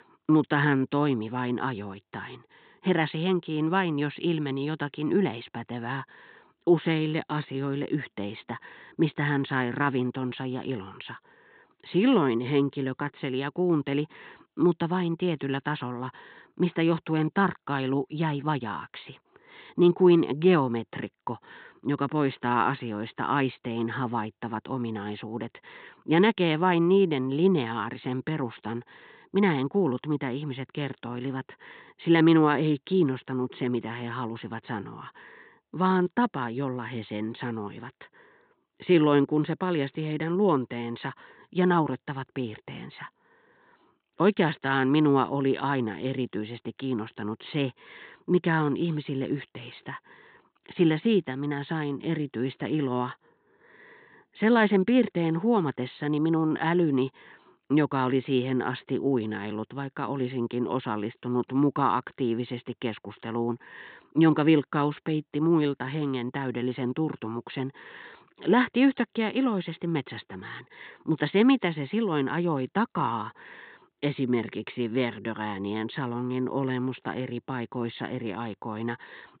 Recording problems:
high frequencies cut off; severe; nothing above 4 kHz

